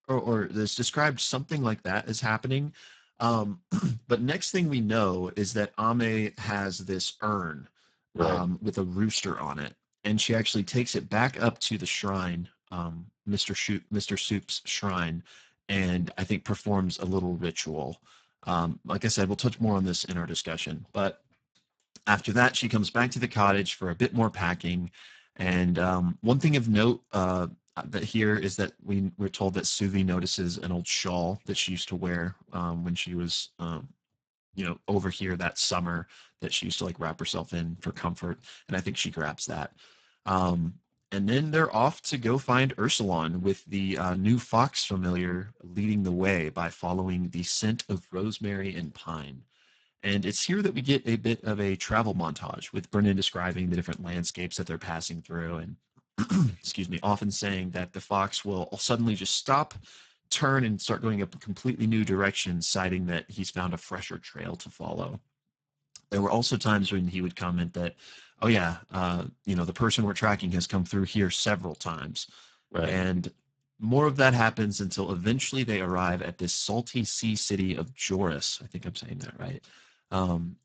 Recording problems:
garbled, watery; badly; nothing above 8 kHz

